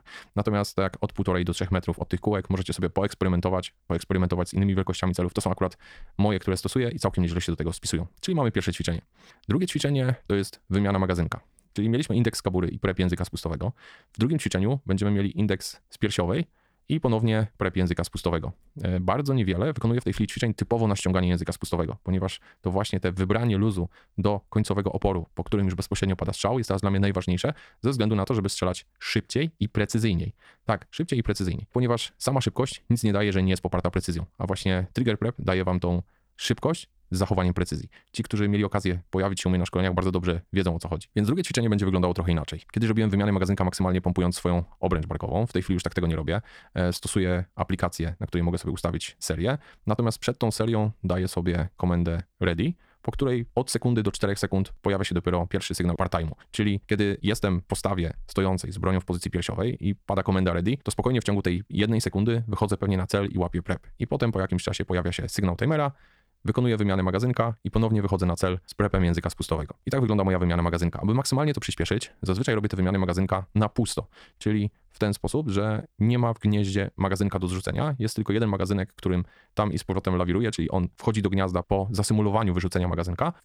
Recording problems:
wrong speed, natural pitch; too fast; 1.6 times normal speed

